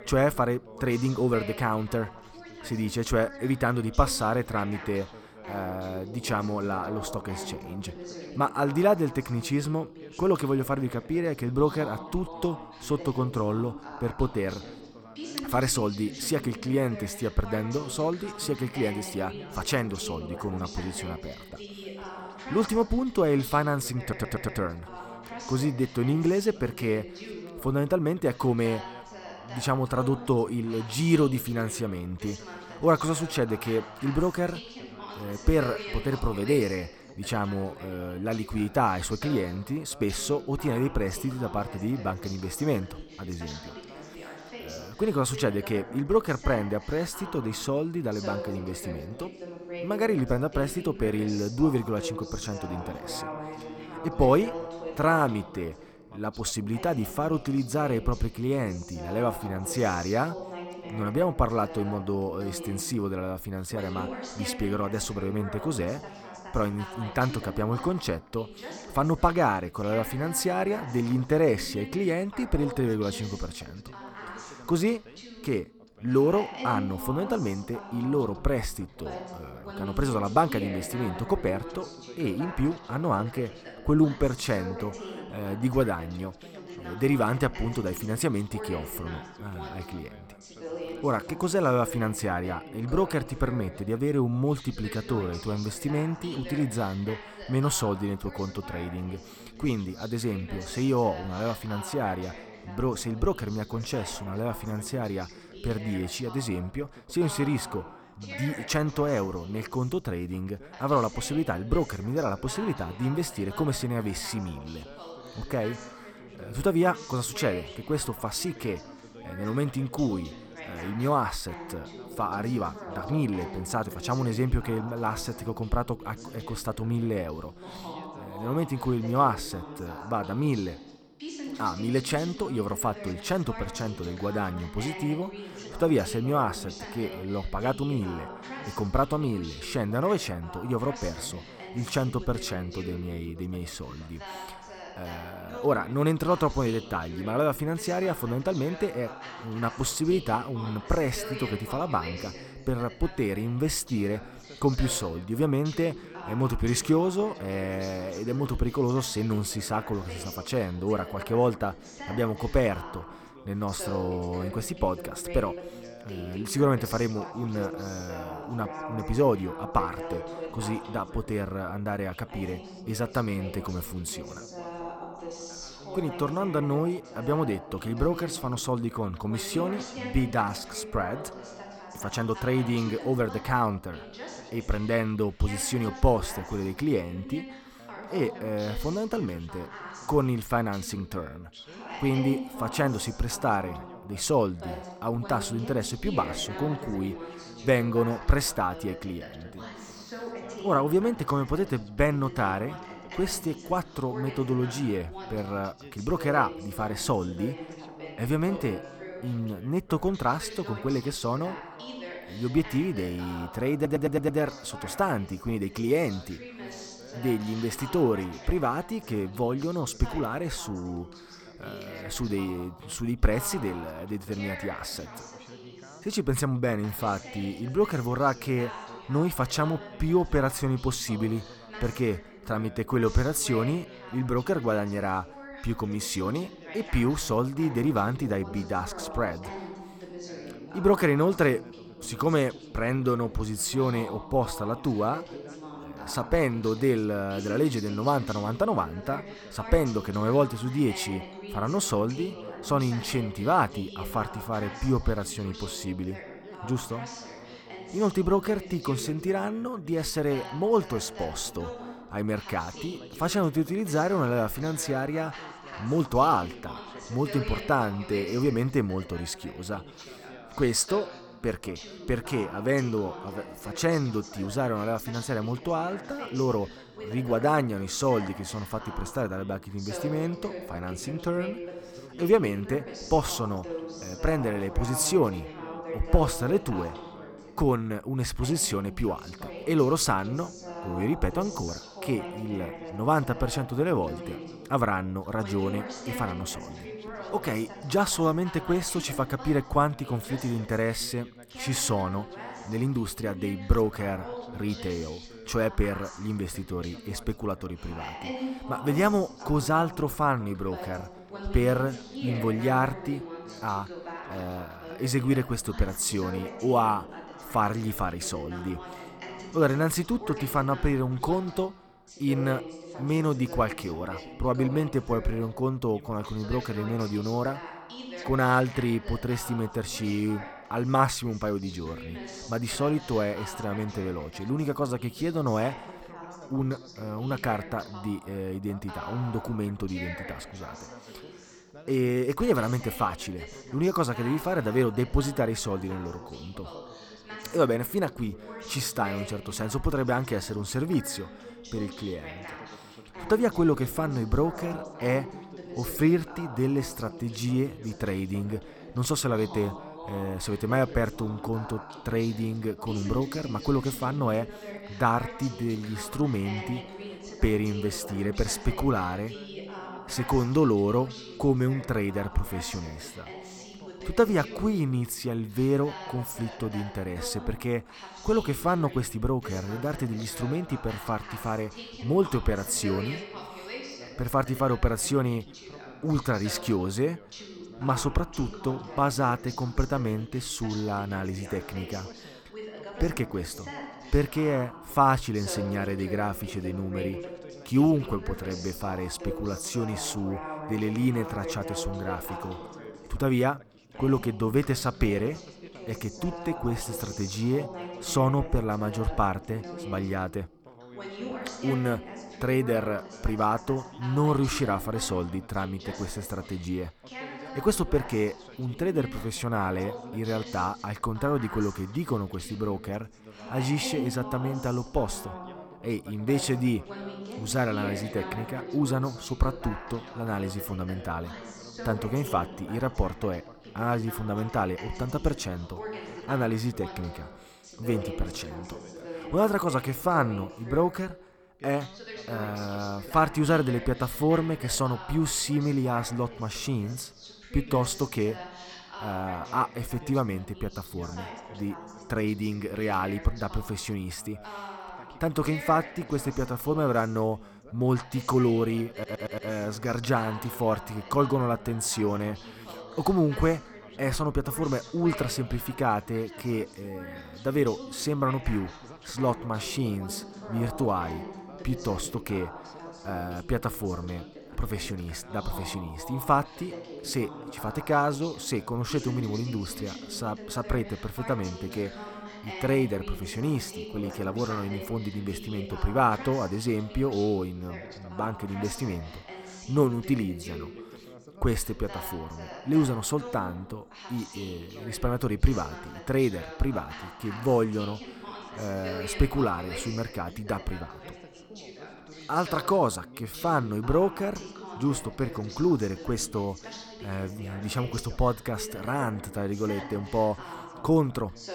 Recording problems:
background chatter; noticeable; throughout; 2 voices, 10 dB below the speech
audio stuttering; at 24 s, at 3:34 and at 7:39

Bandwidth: 18.5 kHz